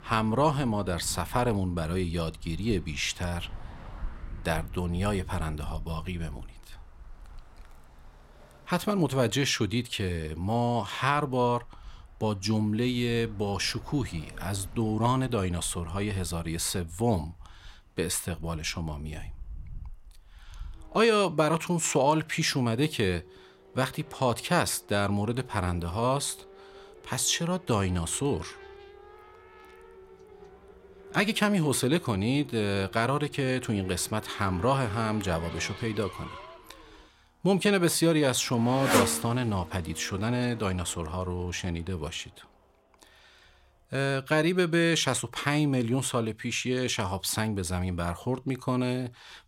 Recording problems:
traffic noise; noticeable; throughout; 15 dB below the speech

